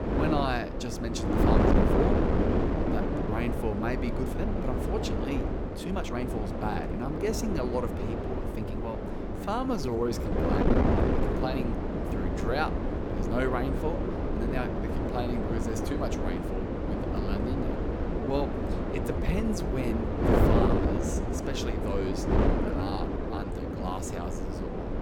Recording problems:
wind noise on the microphone; heavy; 2 dB above the speech
uneven, jittery; strongly; from 2.5 to 24 s

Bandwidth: 18 kHz